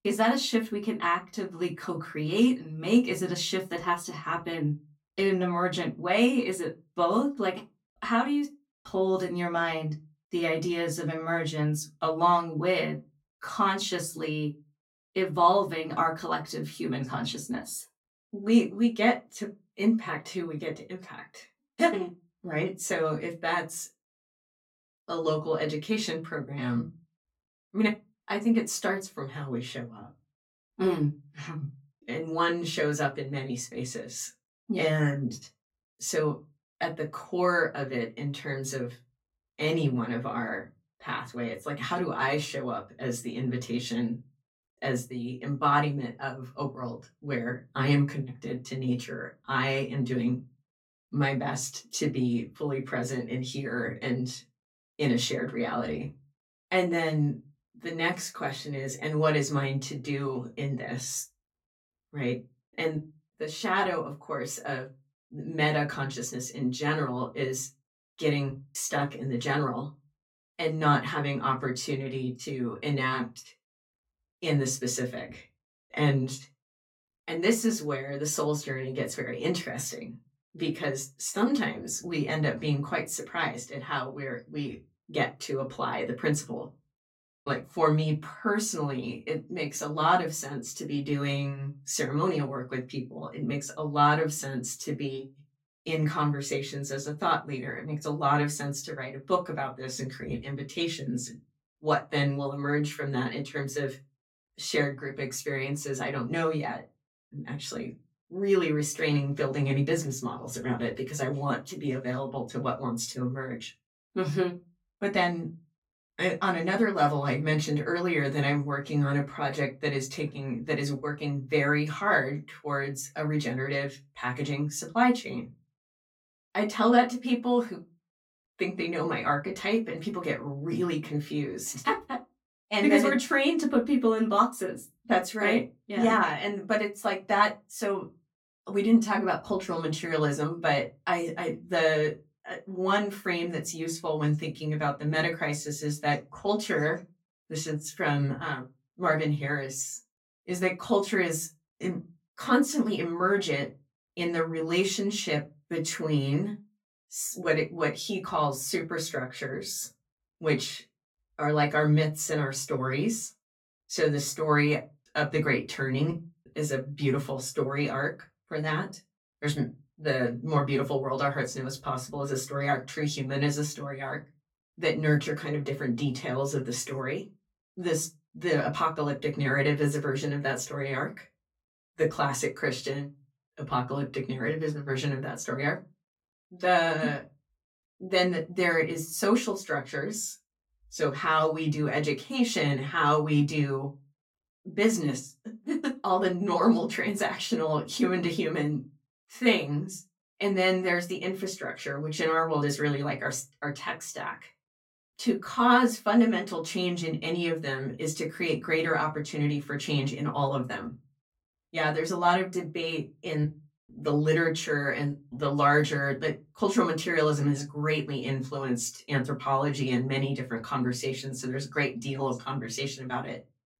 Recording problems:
off-mic speech; far
room echo; very slight; dies away in 0.2 s

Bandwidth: 17 kHz